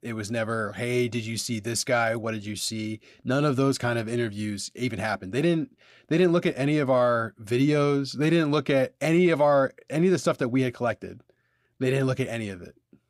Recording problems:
none

